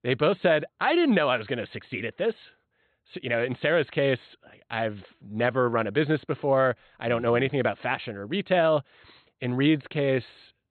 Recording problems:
high frequencies cut off; severe; nothing above 4 kHz

